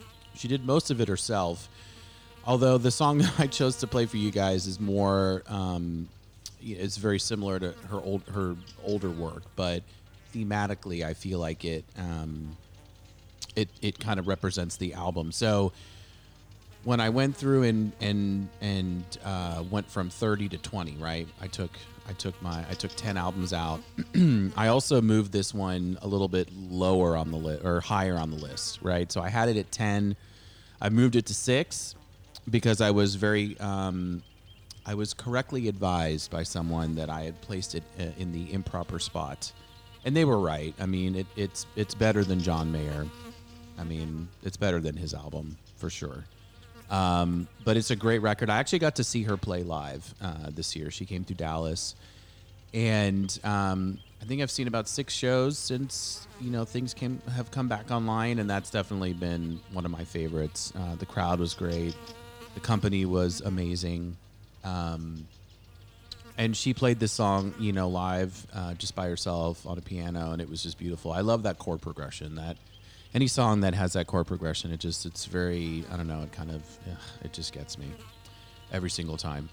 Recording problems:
electrical hum; faint; throughout; 50 Hz, 20 dB below the speech

